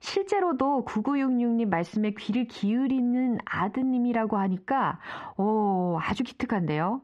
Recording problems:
squashed, flat; heavily
muffled; very slightly; fading above 2 kHz

